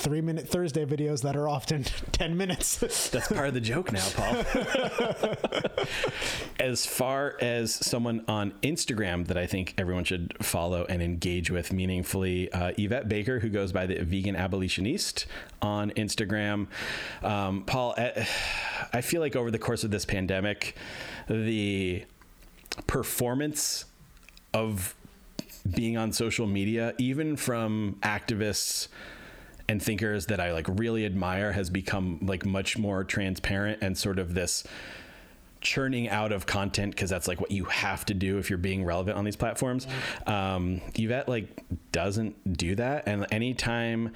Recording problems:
squashed, flat; heavily

